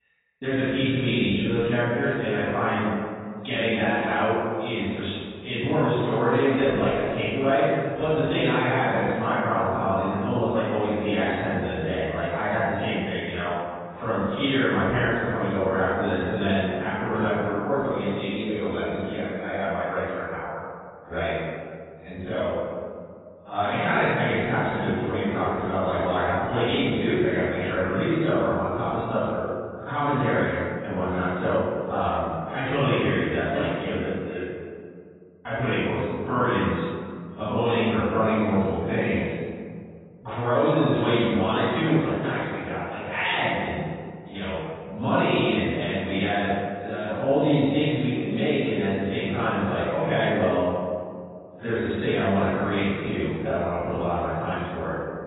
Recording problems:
room echo; strong; dies away in 1.9 s
off-mic speech; far
garbled, watery; badly; nothing above 4 kHz

